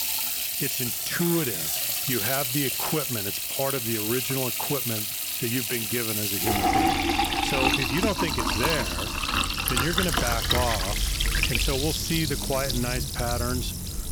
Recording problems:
household noises; very loud; throughout; 4 dB above the speech

